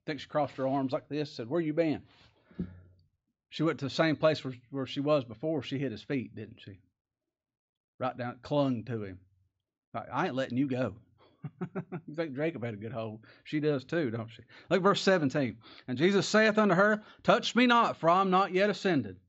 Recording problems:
high frequencies cut off; noticeable; nothing above 7.5 kHz

